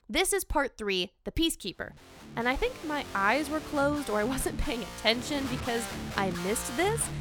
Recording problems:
background music; loud; from 2 s on; 9 dB below the speech

